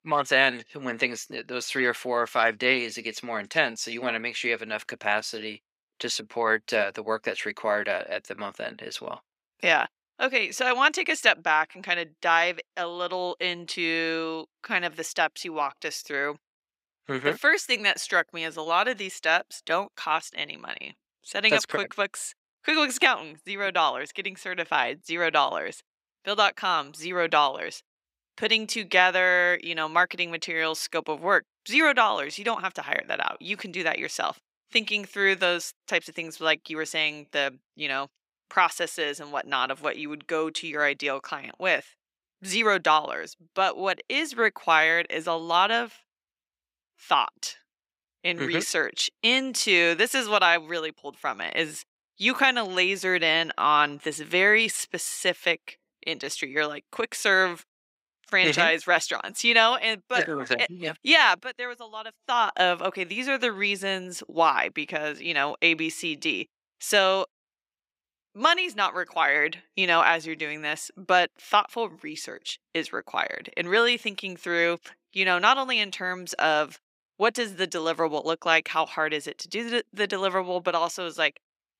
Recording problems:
thin; somewhat; fading below 350 Hz

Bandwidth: 15.5 kHz